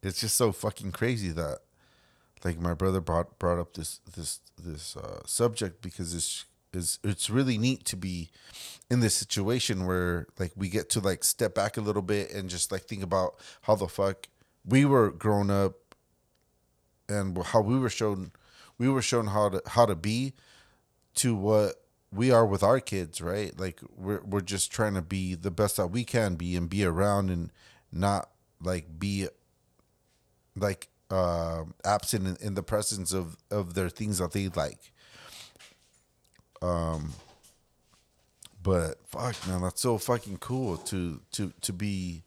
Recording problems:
none

